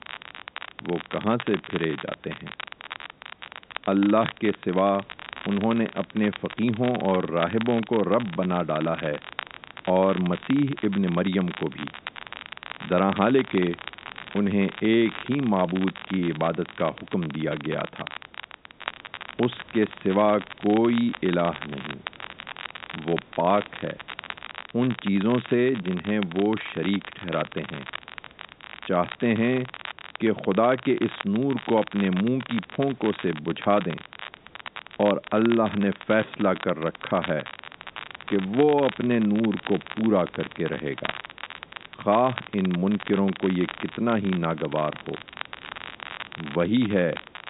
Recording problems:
high frequencies cut off; severe; nothing above 4 kHz
crackle, like an old record; noticeable; 15 dB below the speech
hiss; faint; throughout; 30 dB below the speech

